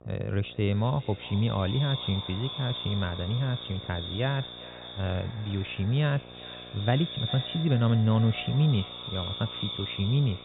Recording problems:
echo of what is said; strong; throughout; 400 ms later, 9 dB below the speech
high frequencies cut off; severe; nothing above 4 kHz
electrical hum; noticeable; throughout; 60 Hz, 20 dB below the speech

